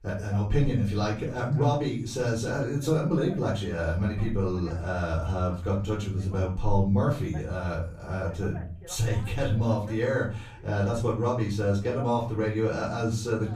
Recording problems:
off-mic speech; far
room echo; slight; dies away in 0.4 s
voice in the background; faint; throughout; 25 dB below the speech

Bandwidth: 15 kHz